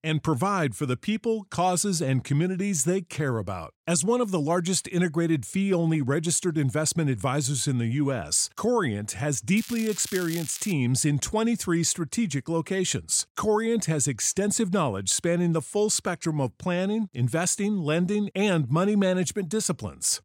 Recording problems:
crackling; noticeable; from 9.5 to 11 s; 15 dB below the speech

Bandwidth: 16 kHz